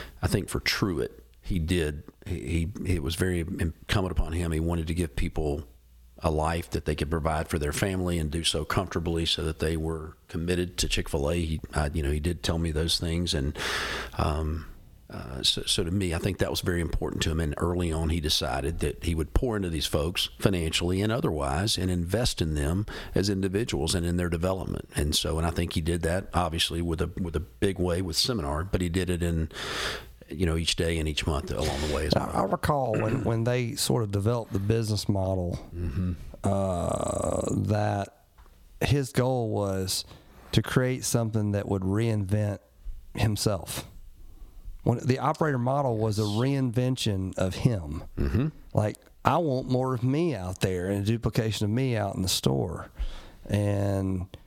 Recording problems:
squashed, flat; heavily

